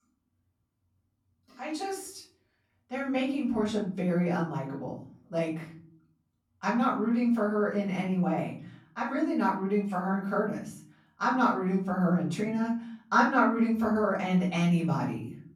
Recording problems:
off-mic speech; far
room echo; noticeable; dies away in 0.6 s

